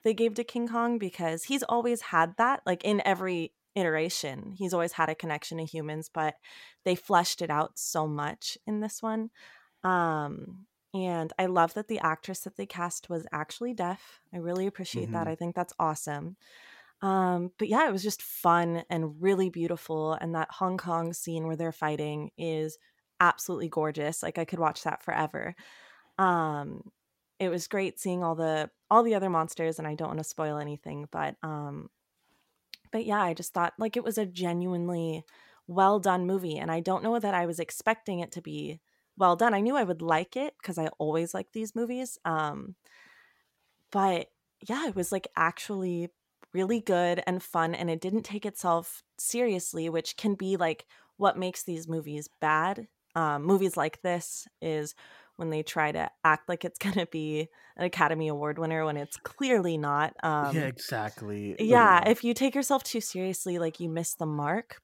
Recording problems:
none

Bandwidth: 16.5 kHz